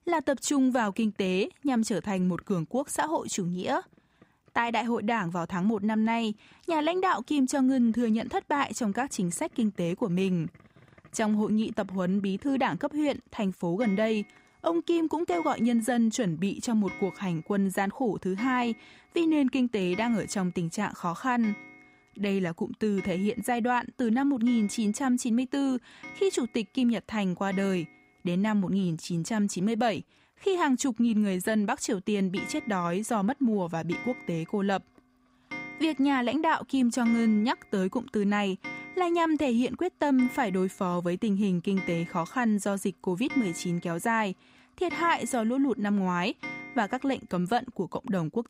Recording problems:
household noises; noticeable; throughout; 15 dB below the speech

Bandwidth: 15.5 kHz